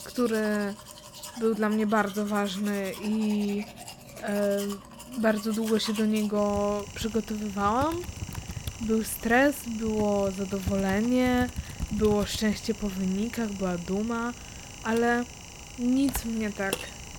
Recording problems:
household noises; noticeable; throughout; 10 dB below the speech

